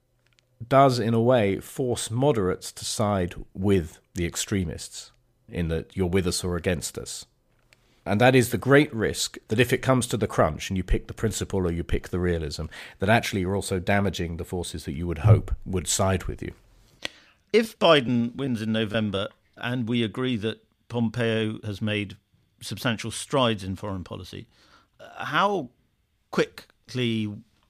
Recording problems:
choppy; very; from 18 to 19 s; 6% of the speech affected

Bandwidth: 15 kHz